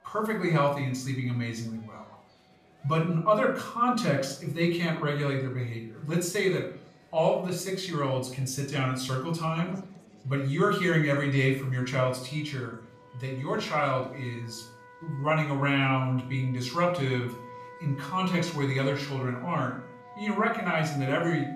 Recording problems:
off-mic speech; far
room echo; slight; dies away in 0.4 s
background music; noticeable; throughout; 20 dB below the speech
chatter from many people; faint; throughout; 30 dB below the speech

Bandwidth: 14.5 kHz